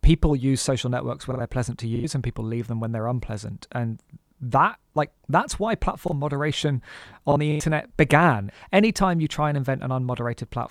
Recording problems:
choppy; very; at 1.5 s and from 6 to 7.5 s; 13% of the speech affected

